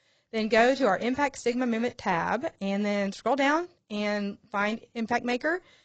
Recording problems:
garbled, watery; badly; nothing above 7.5 kHz

